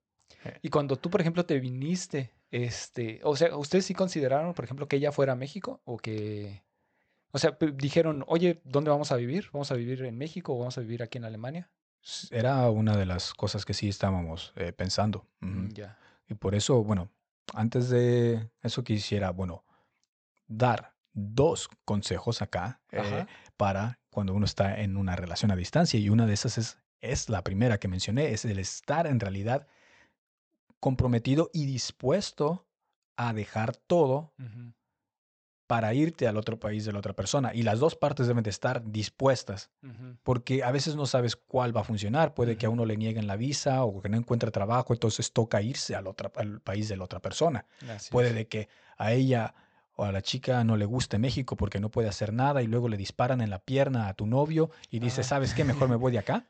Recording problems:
high frequencies cut off; noticeable; nothing above 8 kHz

